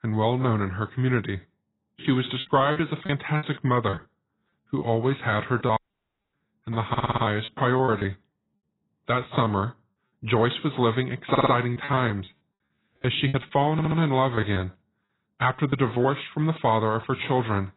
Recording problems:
garbled, watery; badly; nothing above 4 kHz
choppy; very; from 2.5 to 5 s, from 5.5 to 9.5 s and from 12 to 16 s; 11% of the speech affected
audio cutting out; at 6 s for 0.5 s
audio stuttering; at 7 s, at 11 s and at 14 s

